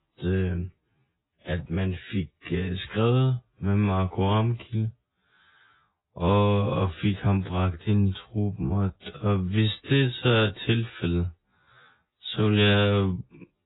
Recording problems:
garbled, watery; badly; nothing above 4 kHz
wrong speed, natural pitch; too slow; 0.6 times normal speed

